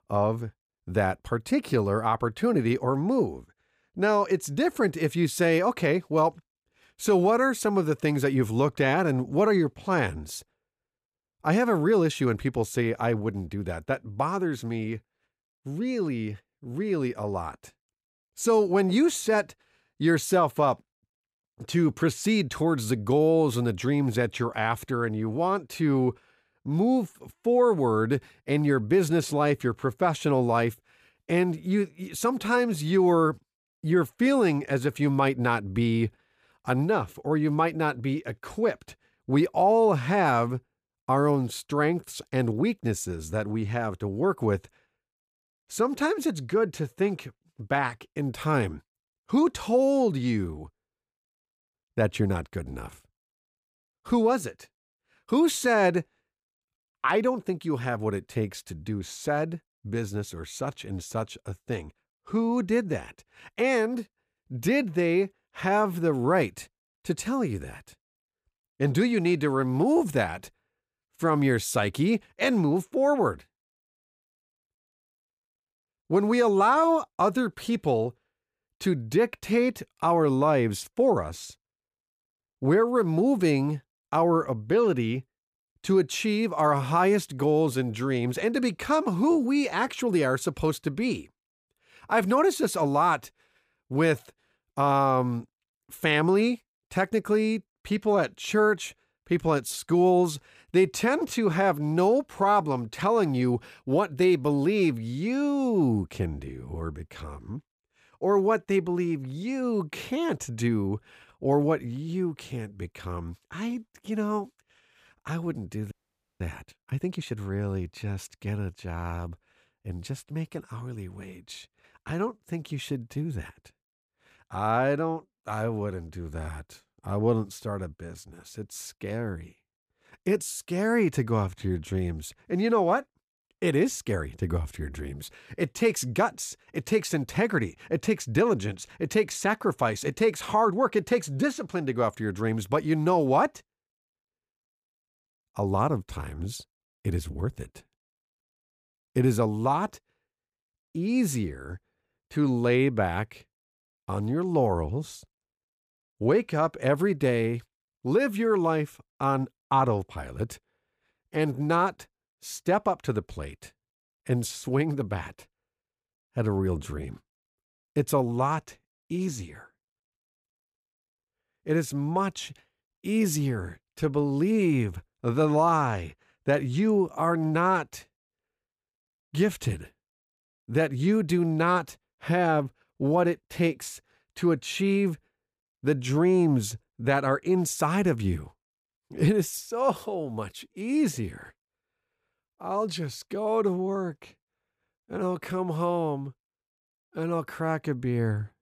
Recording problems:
audio freezing; at 1:56

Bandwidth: 15 kHz